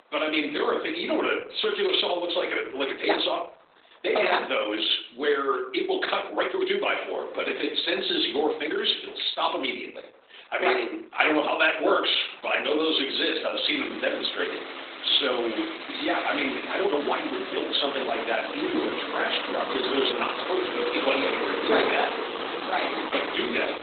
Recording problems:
garbled, watery; badly; nothing above 4 kHz
thin; somewhat; fading below 300 Hz
room echo; slight; dies away in 0.5 s
off-mic speech; somewhat distant
traffic noise; loud; throughout; 6 dB below the speech
uneven, jittery; strongly; from 3 to 23 s

